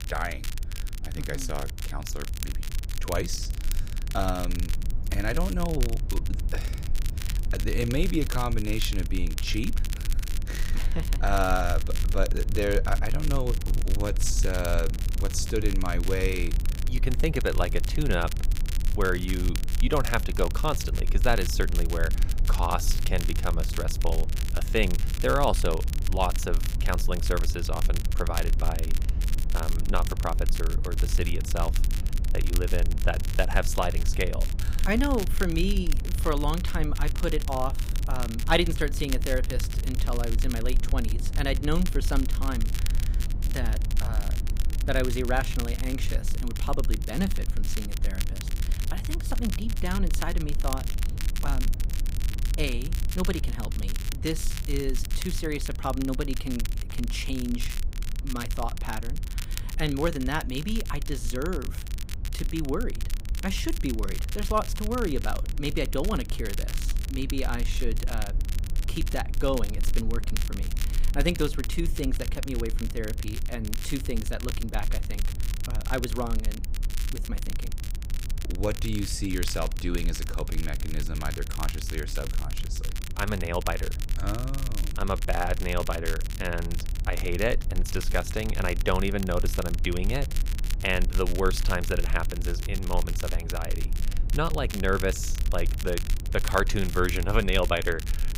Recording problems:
crackle, like an old record; loud; 10 dB below the speech
low rumble; noticeable; throughout; 15 dB below the speech

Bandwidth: 15.5 kHz